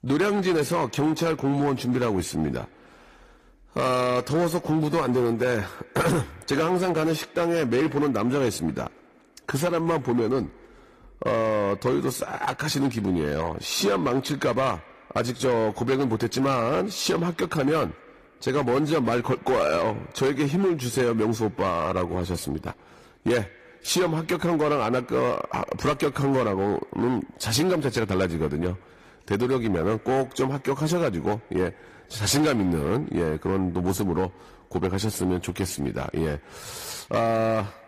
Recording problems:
echo of what is said; faint; throughout; 120 ms later, 25 dB below the speech
distortion; slight; 8% of the sound clipped
garbled, watery; slightly; nothing above 15 kHz

